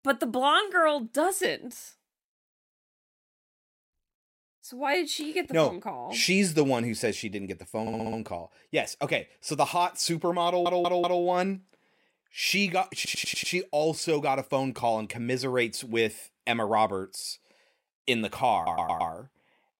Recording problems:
audio stuttering; 4 times, first at 8 s

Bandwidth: 16 kHz